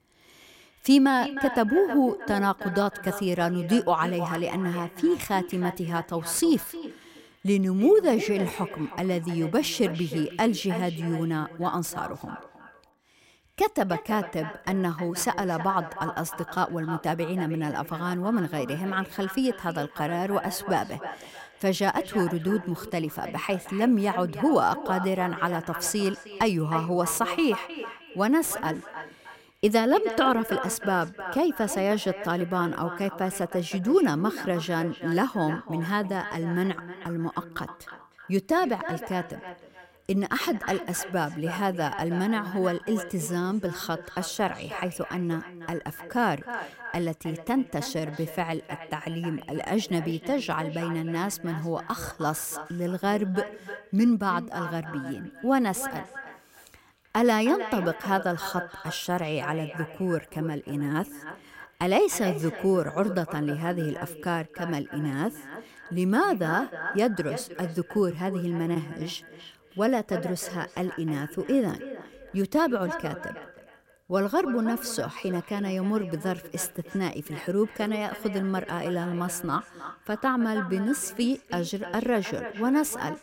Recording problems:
echo of what is said; strong; throughout; 310 ms later, 10 dB below the speech

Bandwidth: 16 kHz